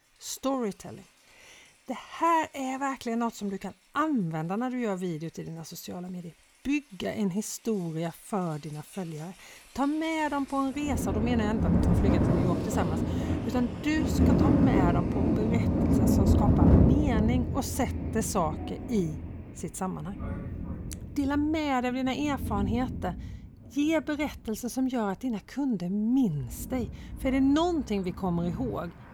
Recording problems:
rain or running water; very loud; throughout; 3 dB above the speech

